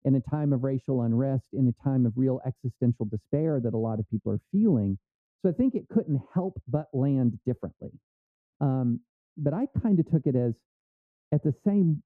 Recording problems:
muffled; very; fading above 1 kHz

